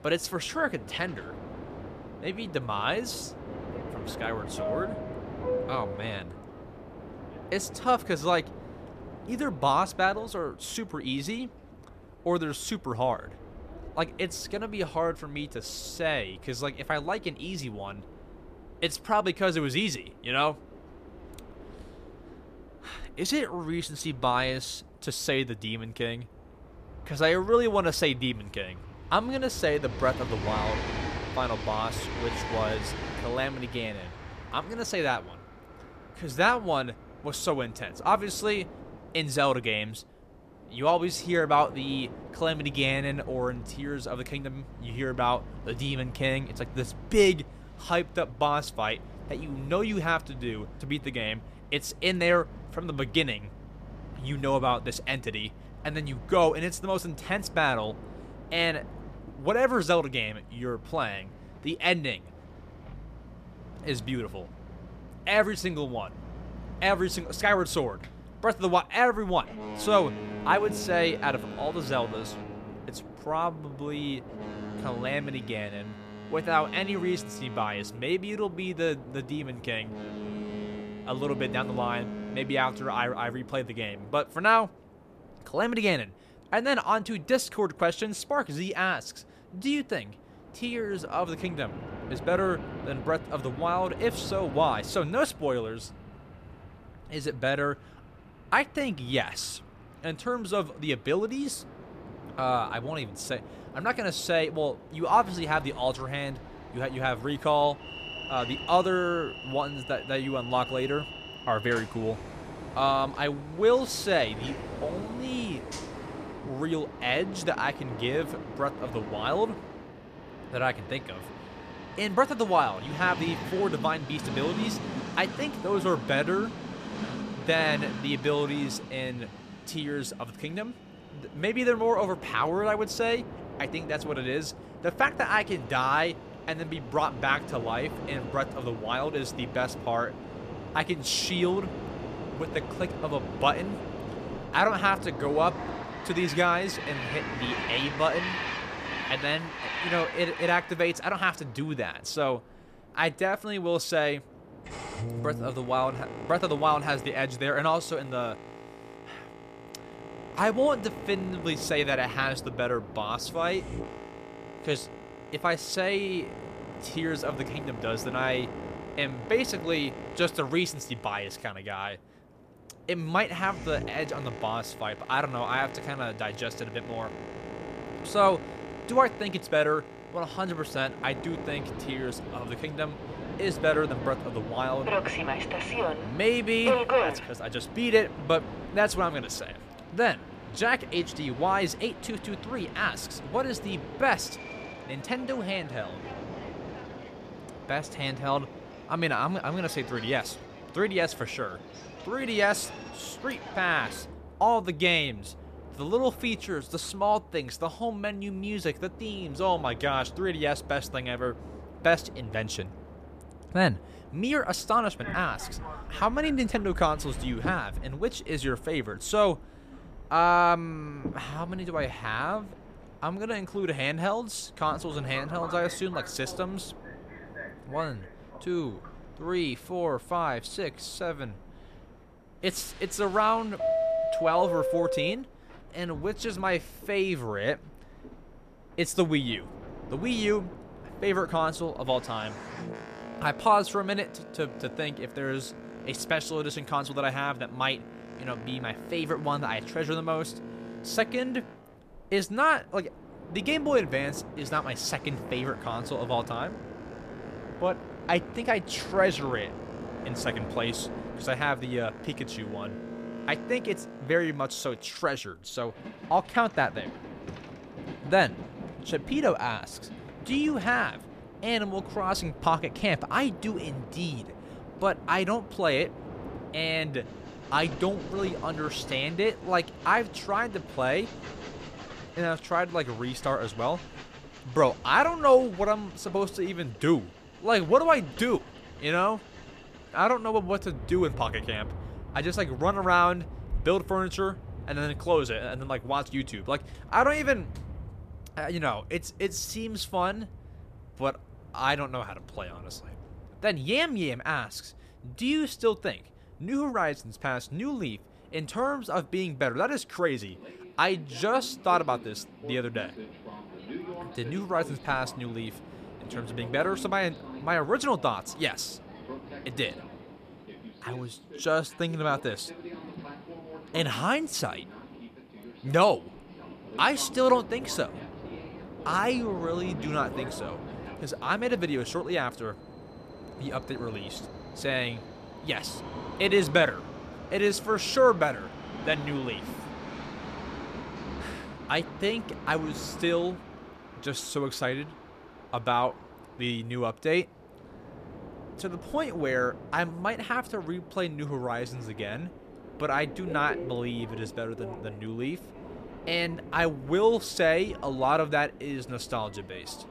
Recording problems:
train or aircraft noise; noticeable; throughout; 10 dB below the speech

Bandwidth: 14.5 kHz